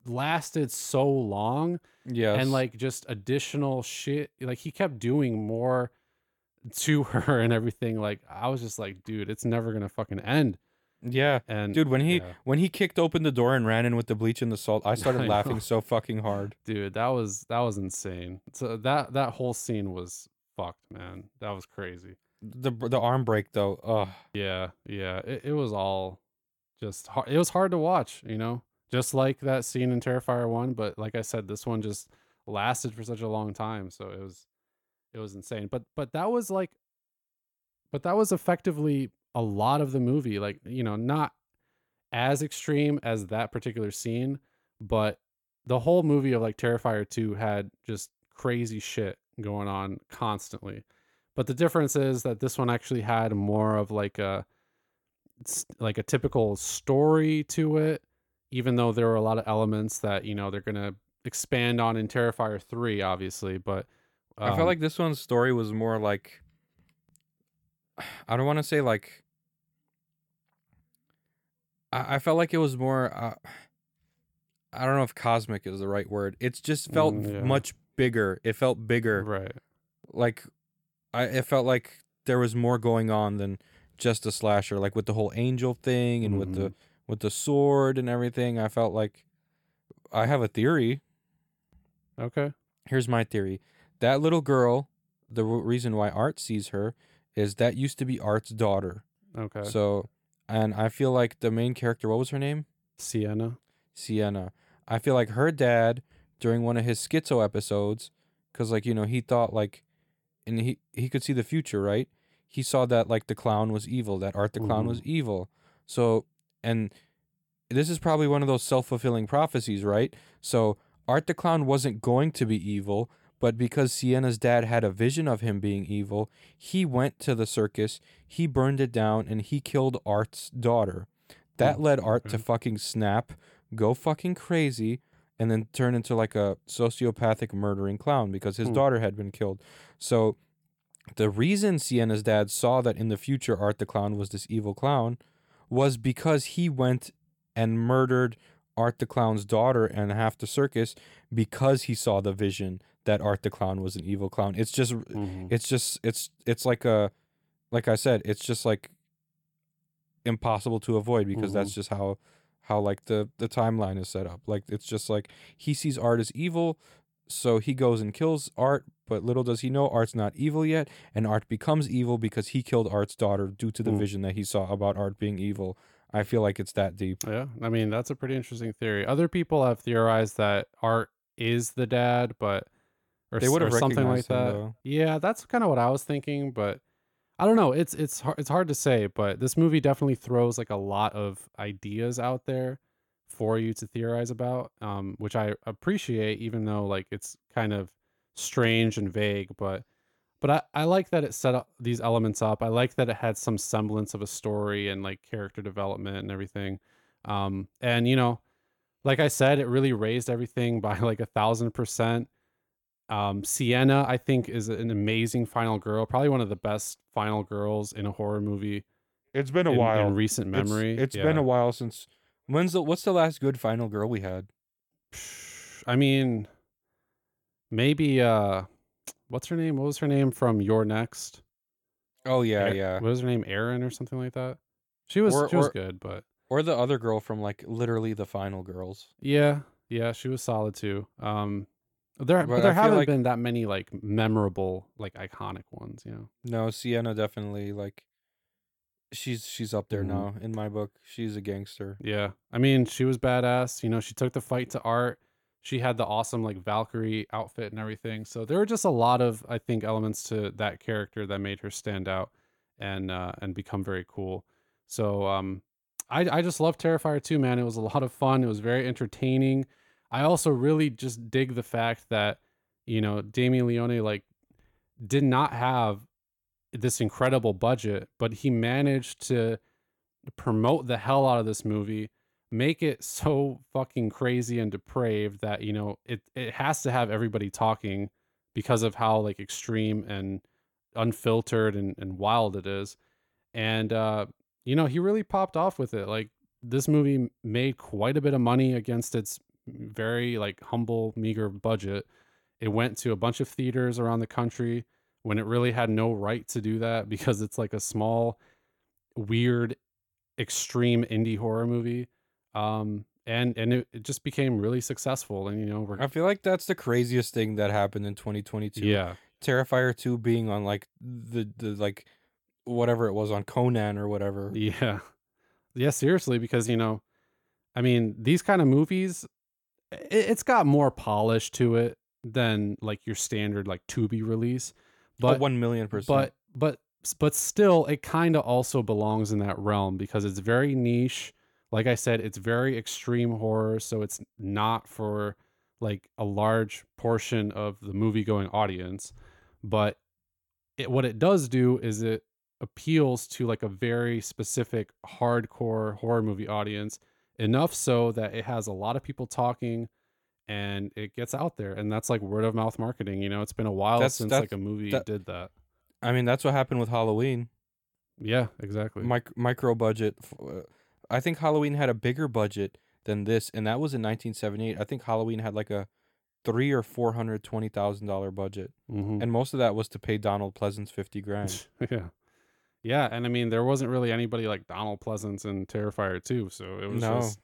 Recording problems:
none

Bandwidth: 17.5 kHz